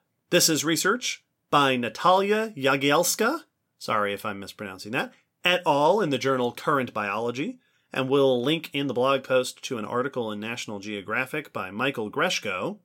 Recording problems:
none

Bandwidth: 16.5 kHz